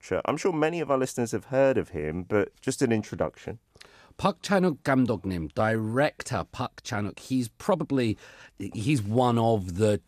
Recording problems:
uneven, jittery; strongly; from 1.5 to 9 s

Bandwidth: 14 kHz